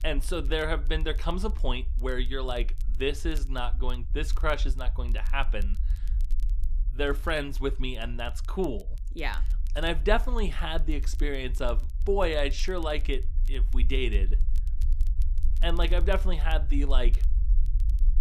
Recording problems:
low rumble; faint; throughout; 25 dB below the speech
crackle, like an old record; faint; 25 dB below the speech

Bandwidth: 14.5 kHz